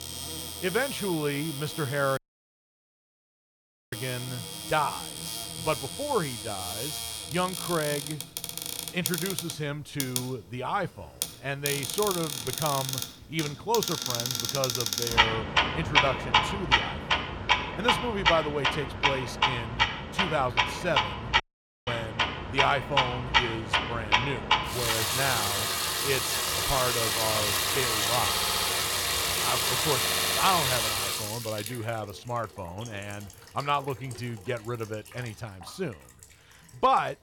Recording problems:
household noises; very loud; throughout; 4 dB above the speech
audio cutting out; at 2 s for 2 s and at 21 s
audio stuttering; at 28 s and at 30 s

